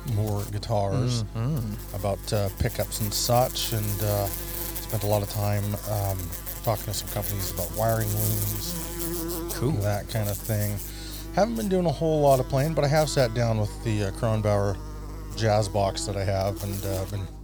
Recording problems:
electrical hum; noticeable; throughout; 50 Hz, 10 dB below the speech

